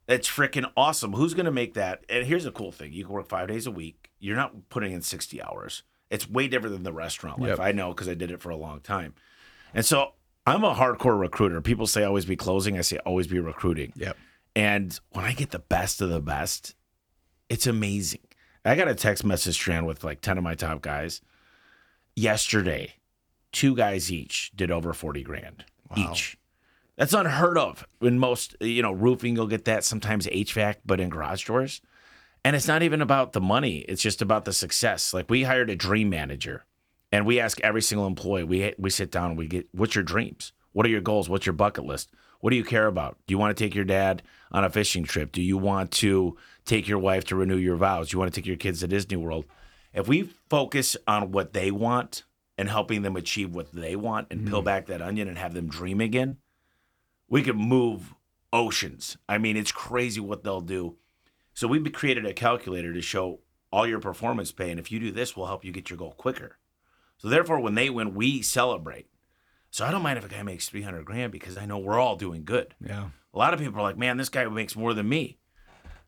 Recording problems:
choppy; occasionally; at 56 s and at 1:12; 1% of the speech affected

